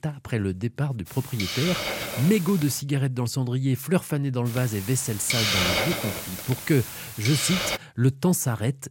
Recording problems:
hiss; loud; from 1 to 3 s and from 4.5 to 8 s; 2 dB below the speech

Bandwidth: 16.5 kHz